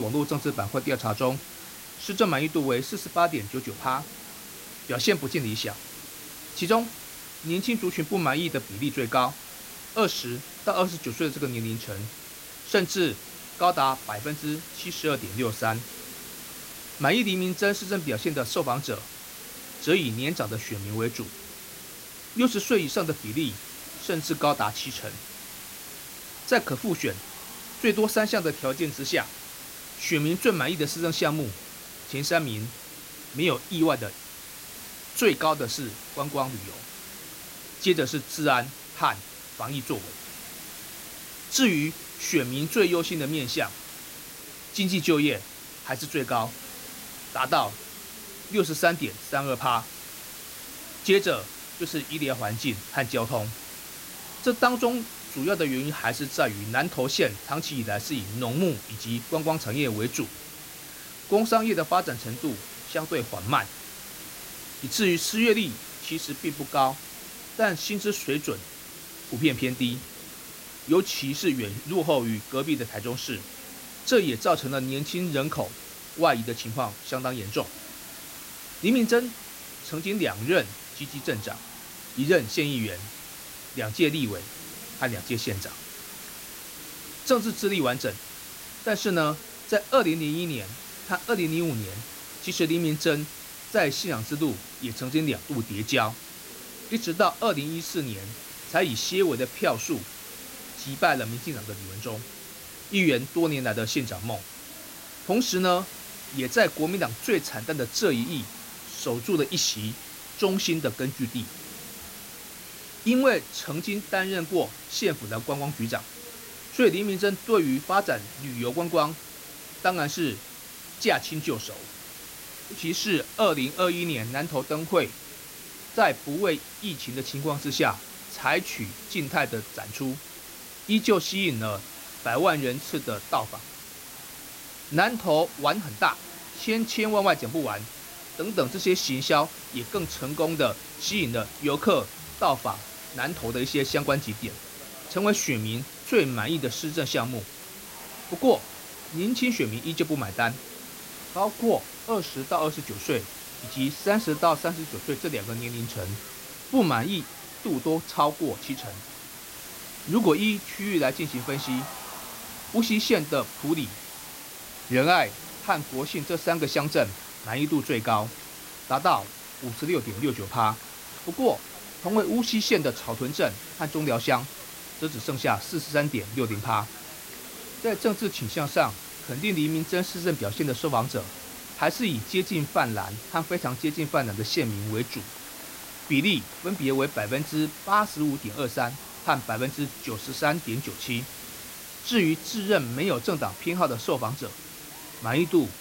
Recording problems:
hiss; noticeable; throughout; 10 dB below the speech
murmuring crowd; faint; throughout; 25 dB below the speech
abrupt cut into speech; at the start

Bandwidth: 16 kHz